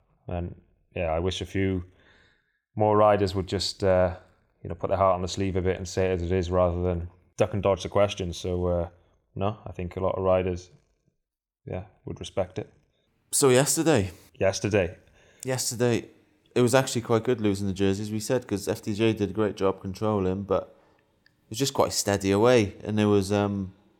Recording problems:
none

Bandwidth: 18 kHz